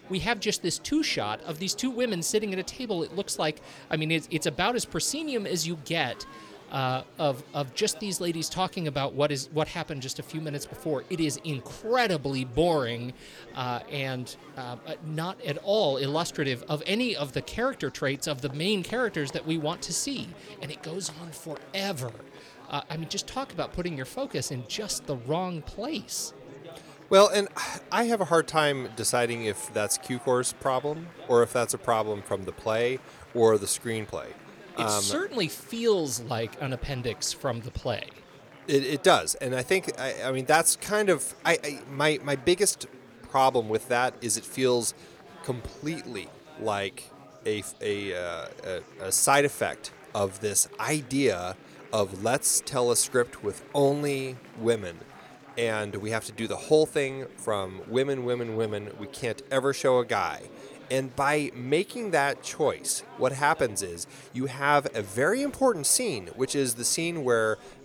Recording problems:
chatter from many people; faint; throughout; 20 dB below the speech

